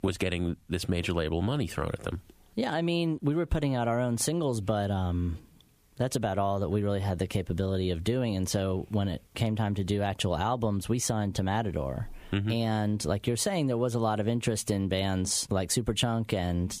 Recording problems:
squashed, flat; somewhat

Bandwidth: 15 kHz